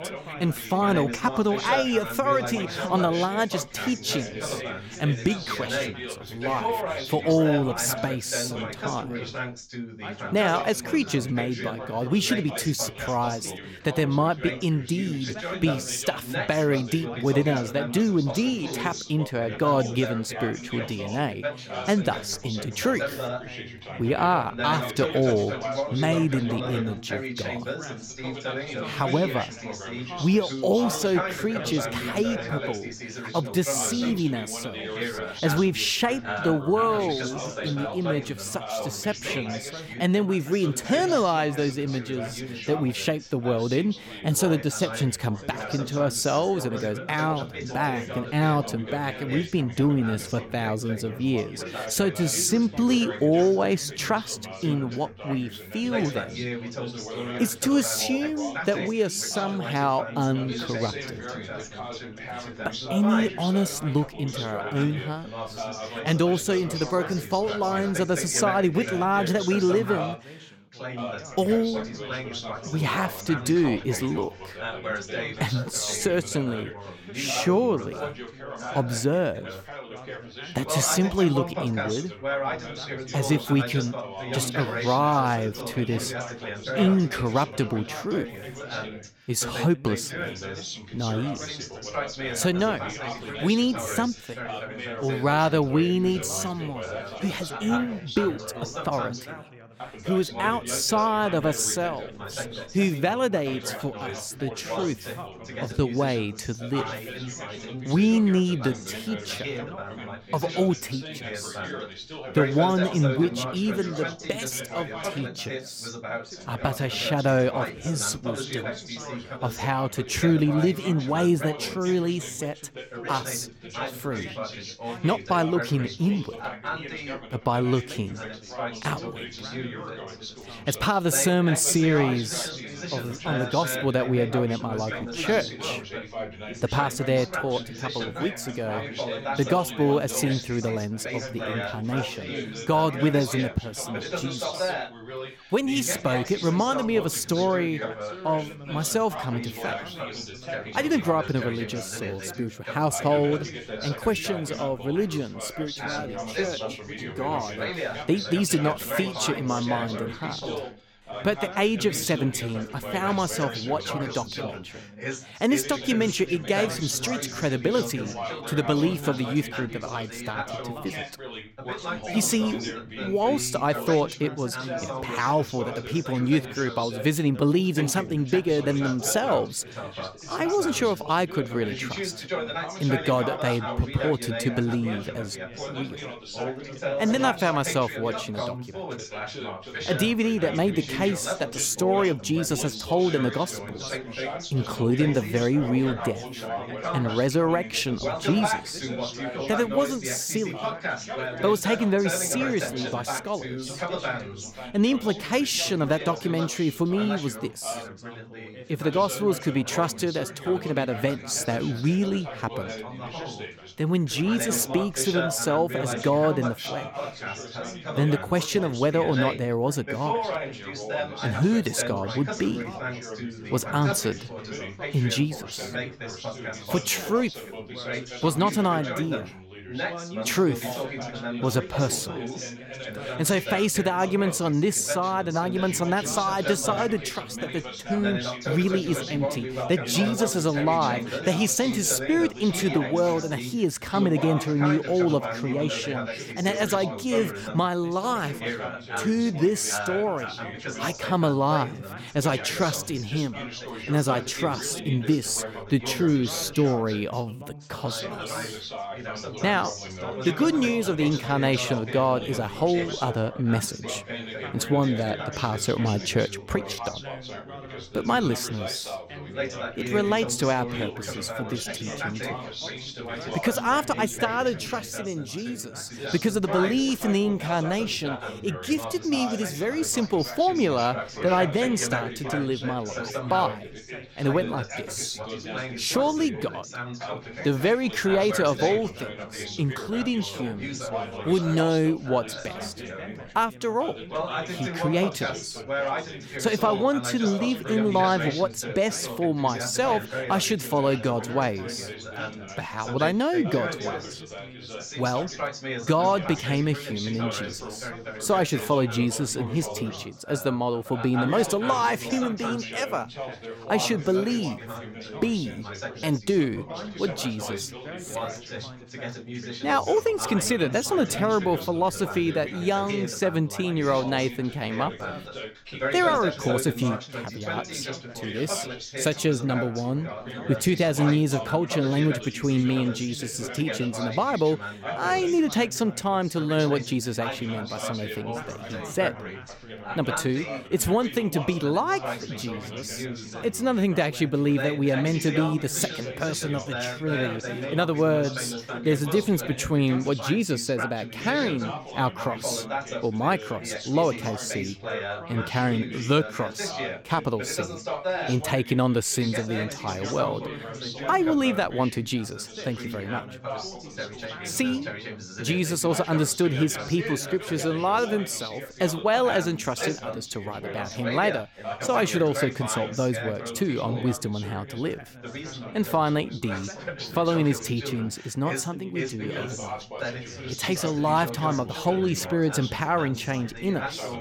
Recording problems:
background chatter; loud; throughout; 3 voices, 8 dB below the speech

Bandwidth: 17 kHz